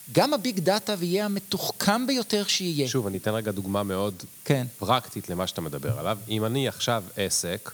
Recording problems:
hiss; noticeable; throughout; 15 dB below the speech

